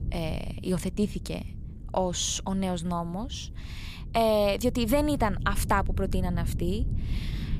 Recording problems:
wind noise on the microphone; occasional gusts; 20 dB below the speech

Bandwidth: 15 kHz